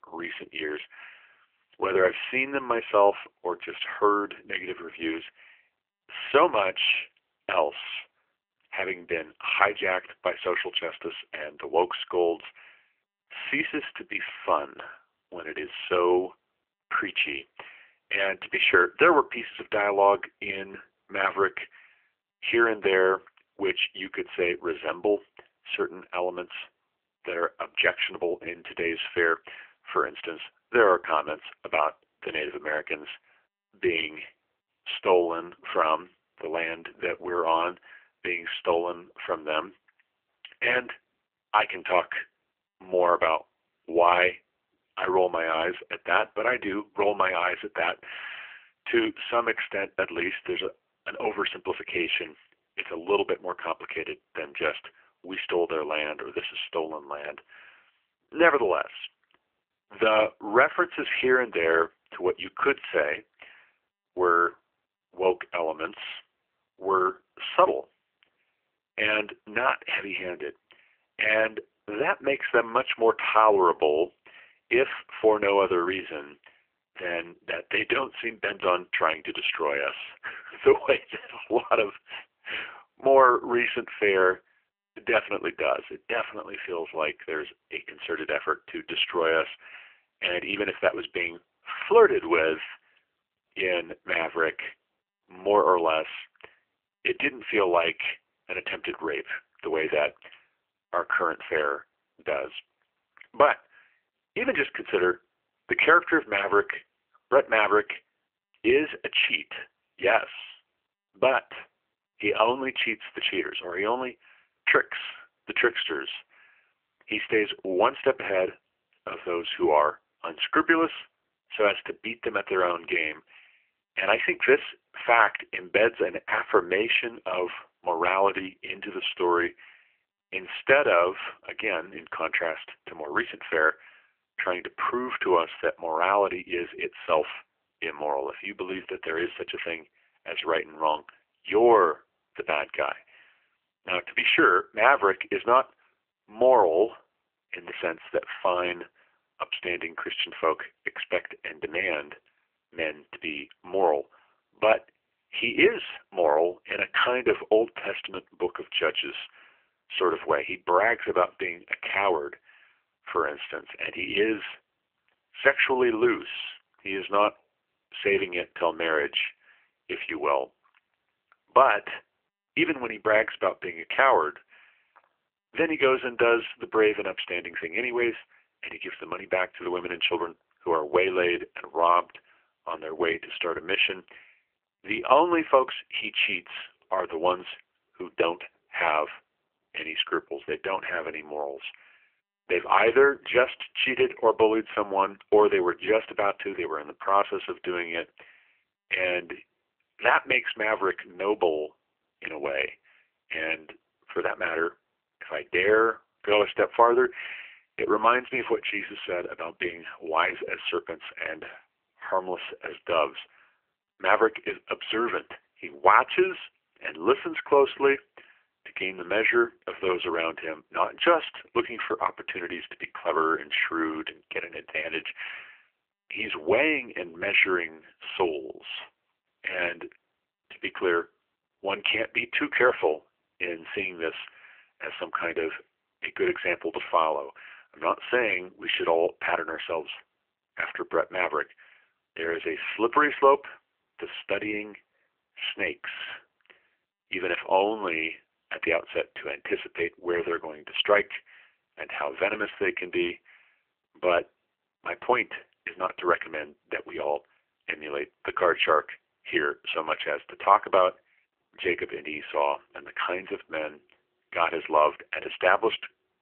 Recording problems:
phone-call audio; poor line; nothing above 3 kHz

